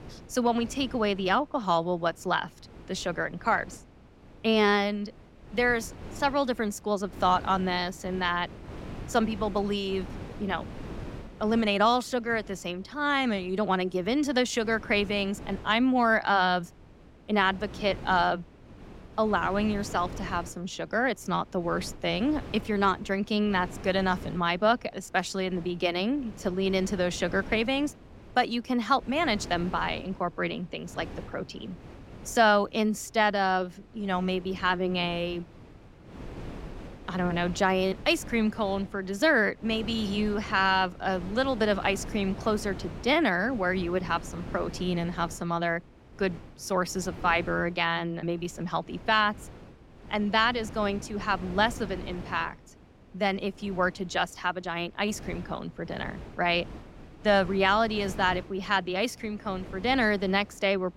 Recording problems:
wind noise on the microphone; occasional gusts; 20 dB below the speech

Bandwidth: 16 kHz